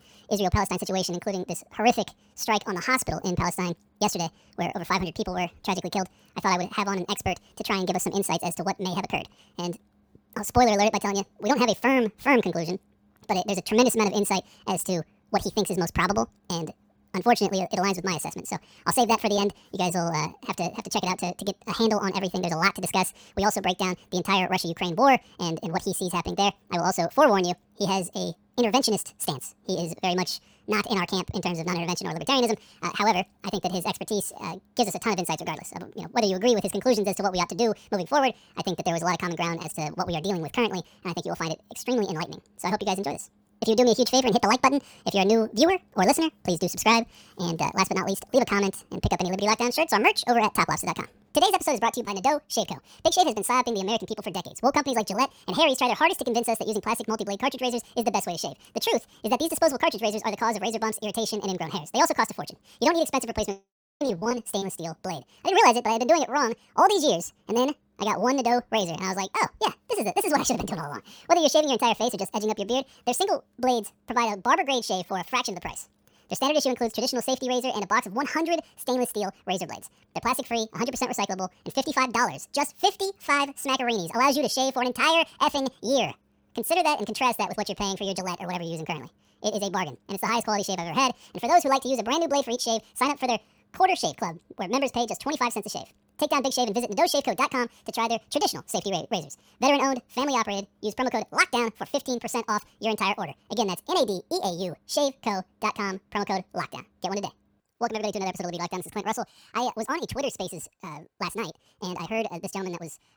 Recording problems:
wrong speed and pitch; too fast and too high; 1.7 times normal speed

